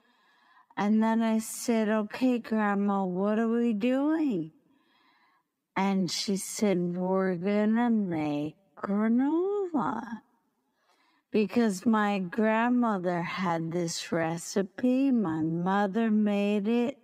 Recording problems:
wrong speed, natural pitch; too slow; 0.5 times normal speed

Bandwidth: 15.5 kHz